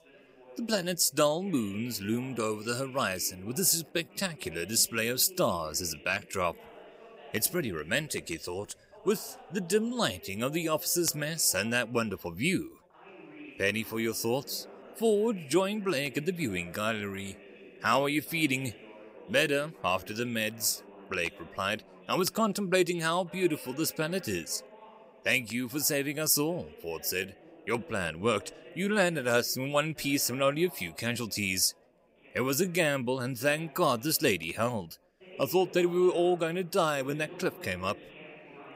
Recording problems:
background chatter; faint; throughout; 3 voices, 20 dB below the speech

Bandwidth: 15.5 kHz